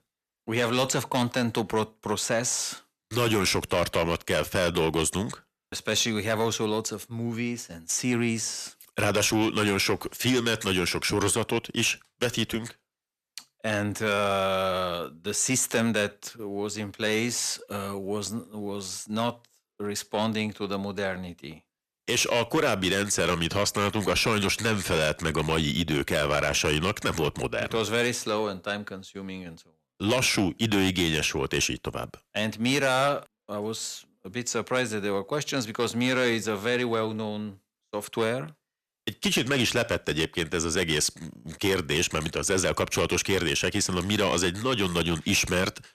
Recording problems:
distortion; slight; 10 dB below the speech

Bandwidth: 14.5 kHz